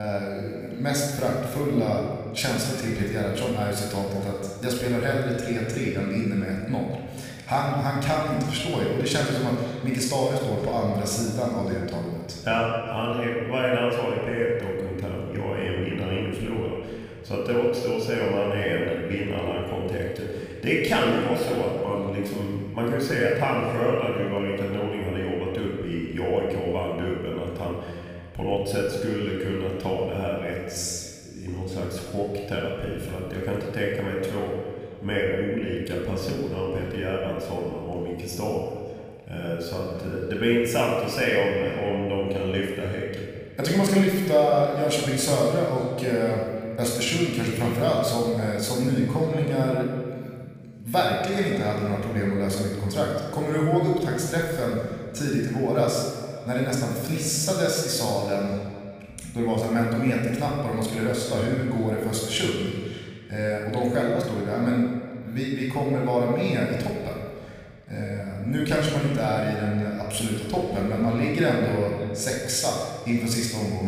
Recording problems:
off-mic speech; far
room echo; noticeable; dies away in 1.7 s
echo of what is said; faint; throughout; 580 ms later, 25 dB below the speech
abrupt cut into speech; at the start and the end

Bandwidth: 15 kHz